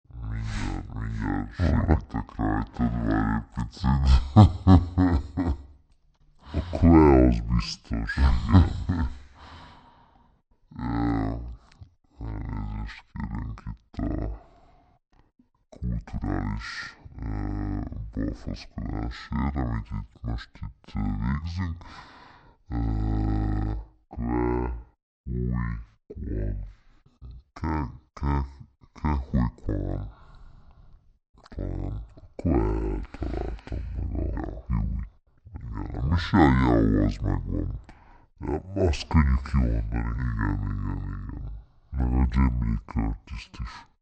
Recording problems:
wrong speed and pitch; too slow and too low; 0.5 times normal speed

